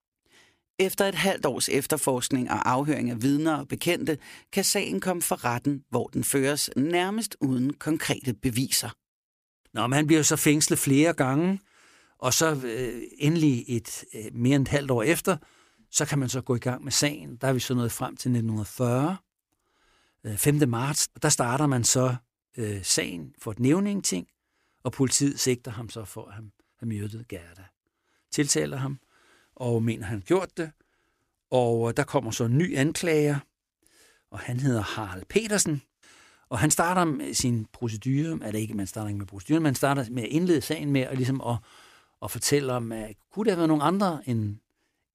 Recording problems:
none

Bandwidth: 15 kHz